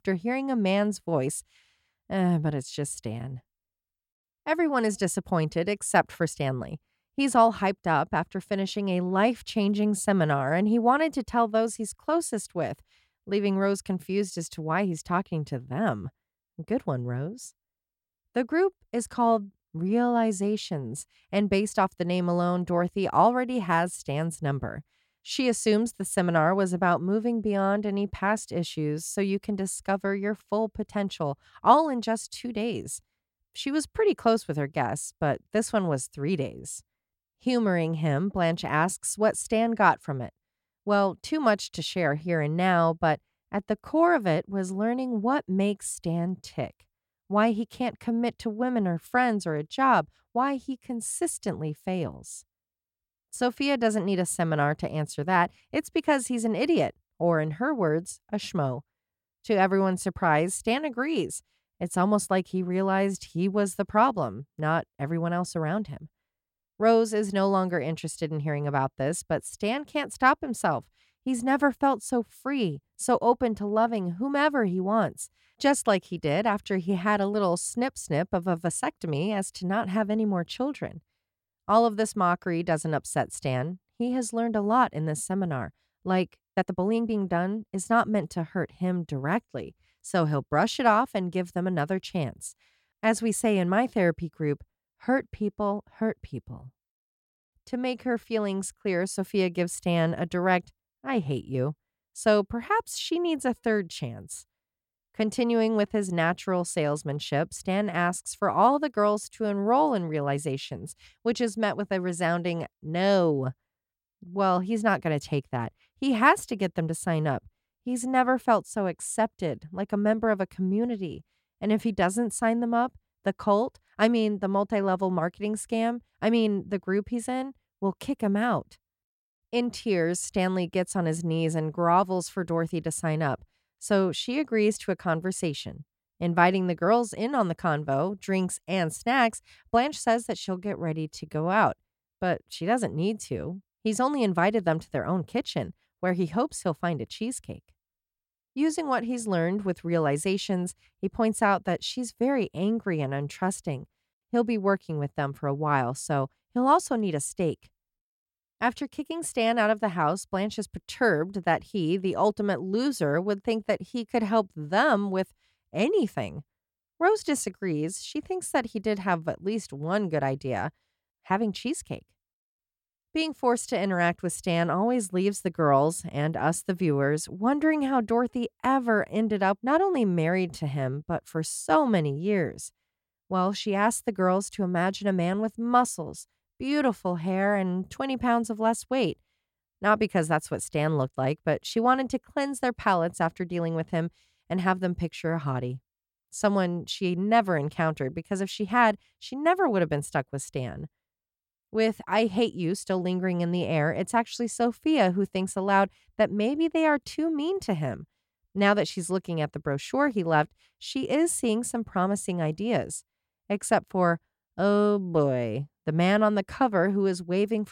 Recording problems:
uneven, jittery; strongly; from 1:26 to 2:22

